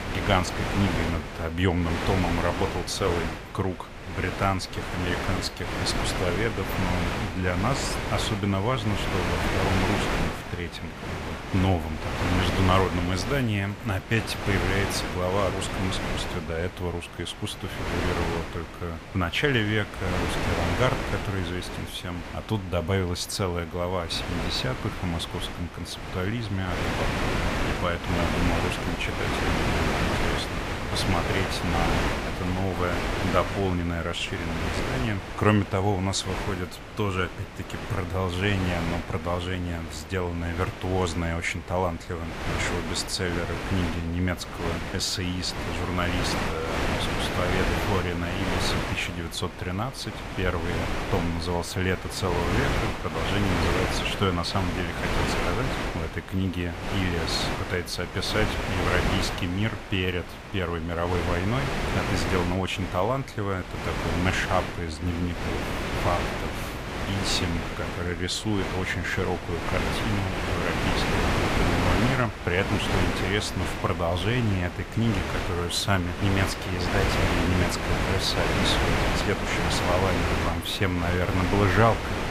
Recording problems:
wind noise on the microphone; heavy; as loud as the speech

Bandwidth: 14.5 kHz